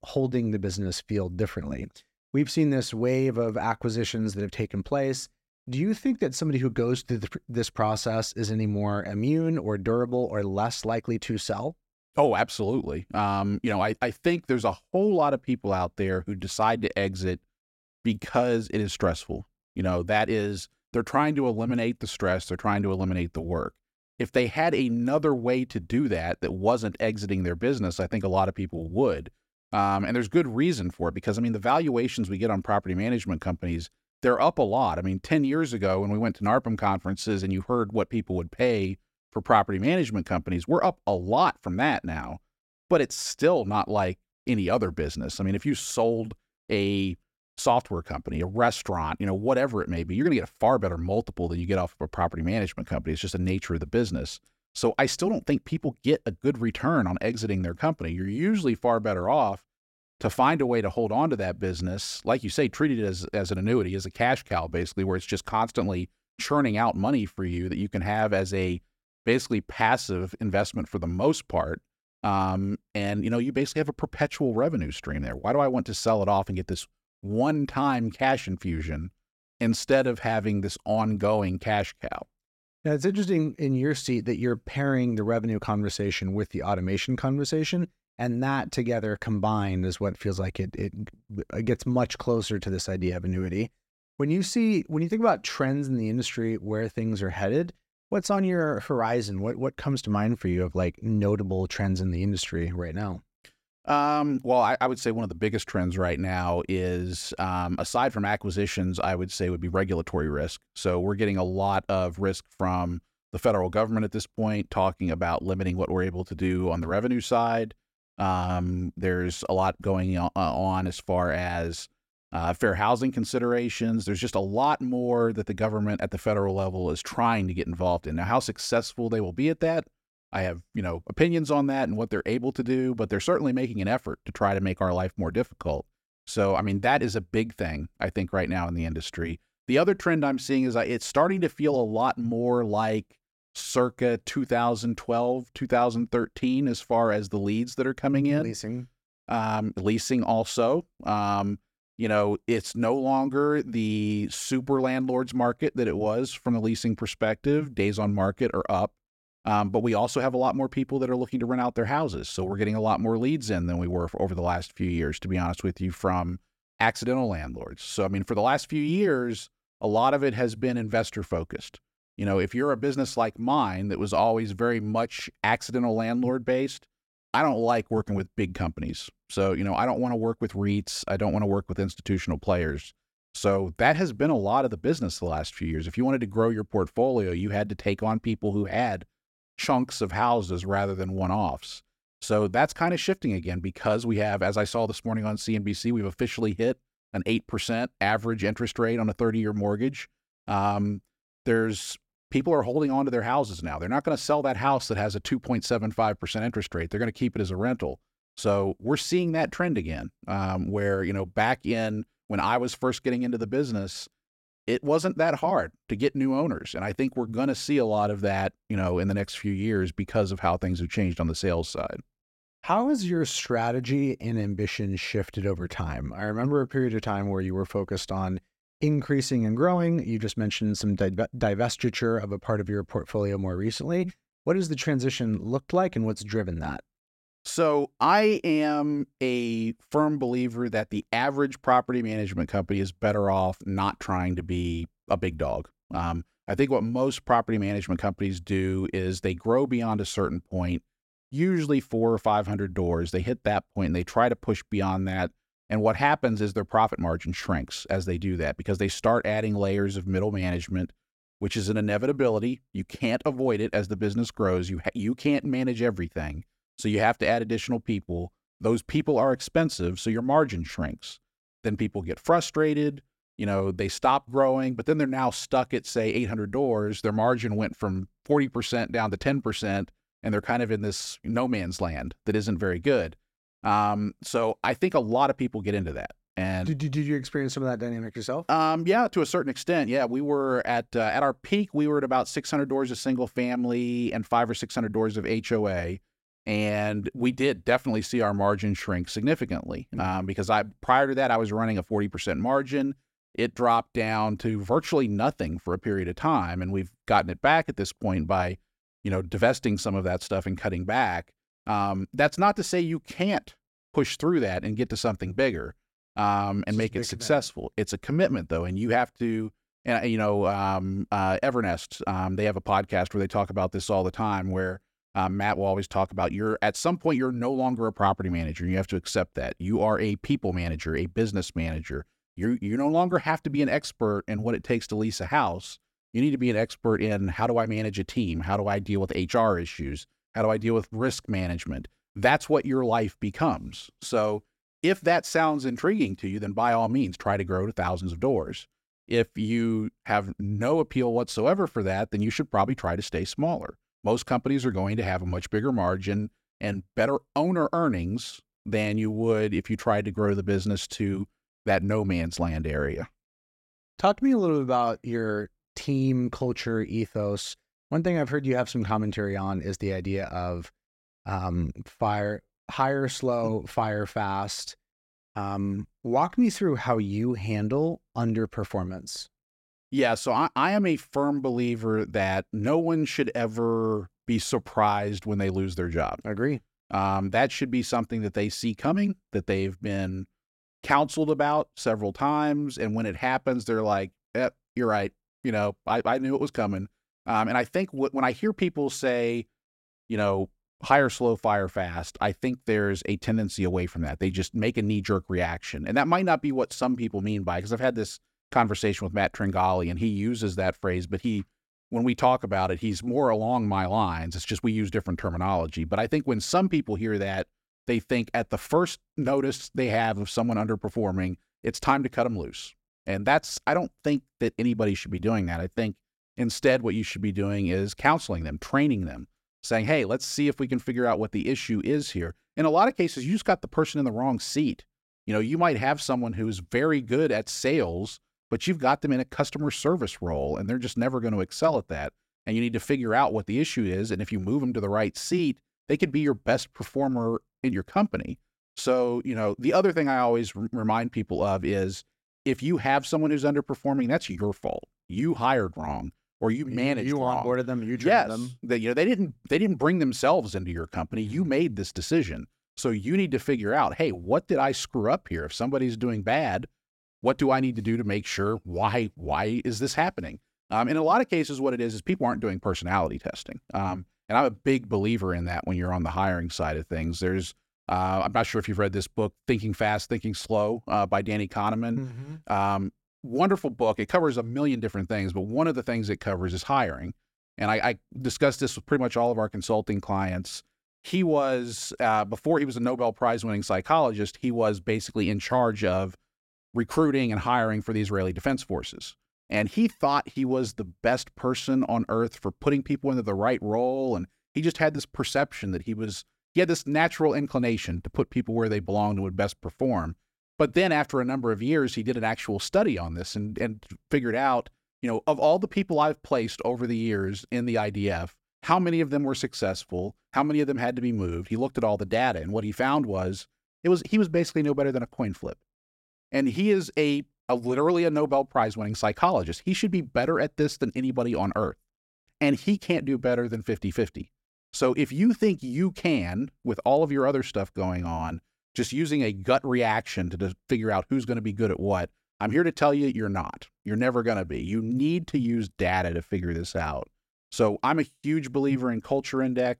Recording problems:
none

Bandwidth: 16 kHz